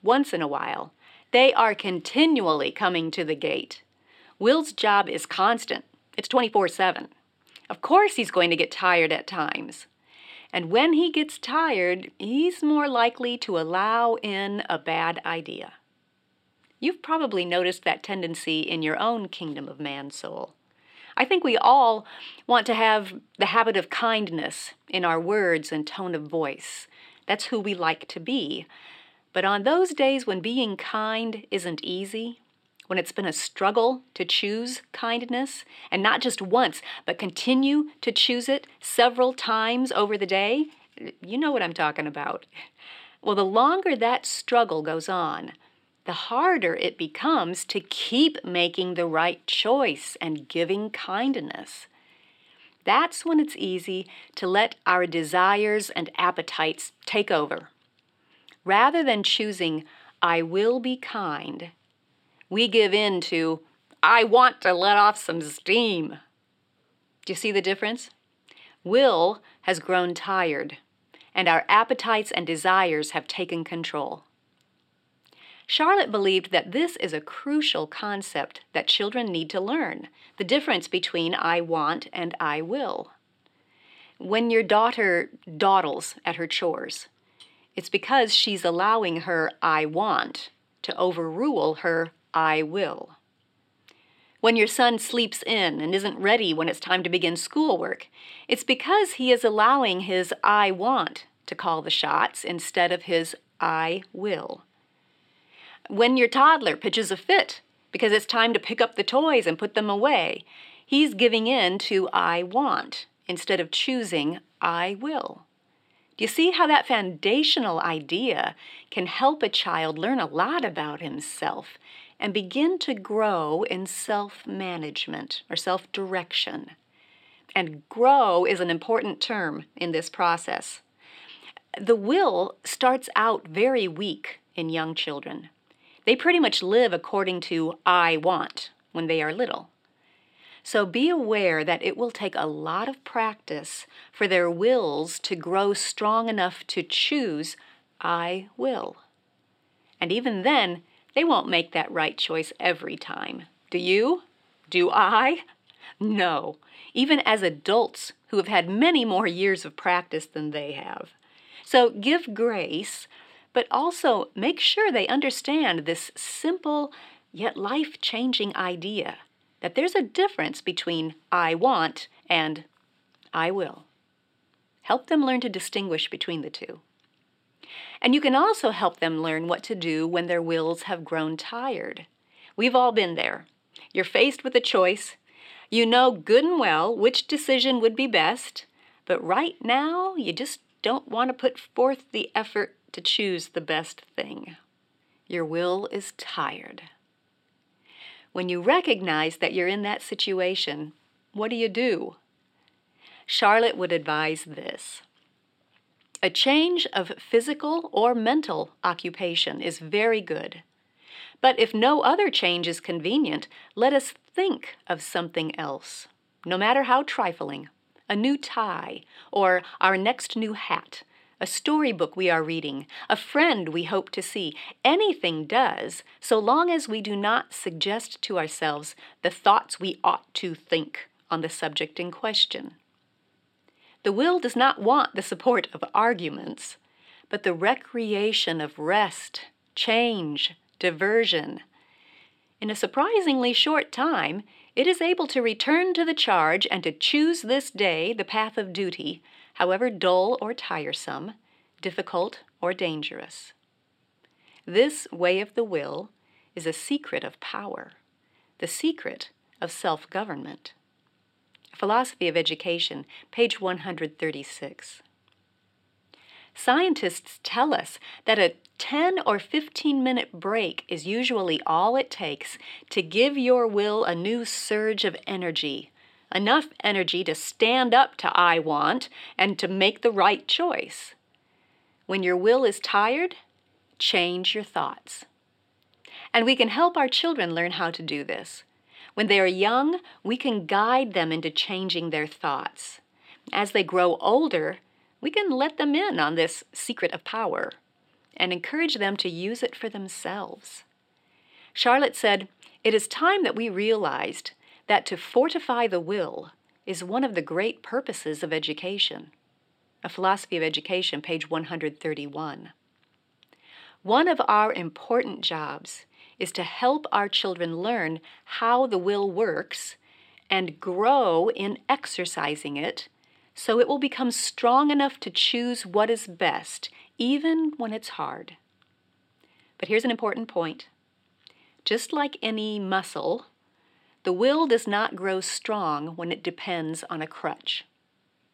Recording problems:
thin; very slightly; fading below 300 Hz
uneven, jittery; strongly; from 6 s to 5:30

